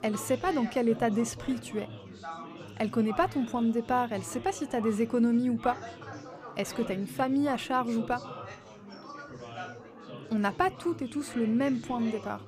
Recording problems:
chatter from many people; noticeable; throughout; 15 dB below the speech

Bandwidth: 15 kHz